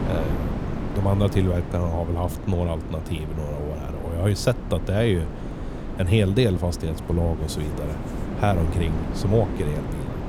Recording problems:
wind noise on the microphone; heavy; 8 dB below the speech
wind in the background; faint; throughout; 25 dB below the speech

